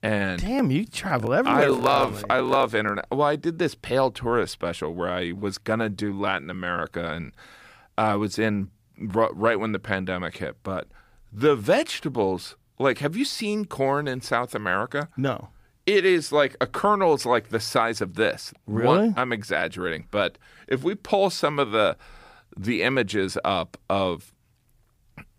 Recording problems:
none

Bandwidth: 15.5 kHz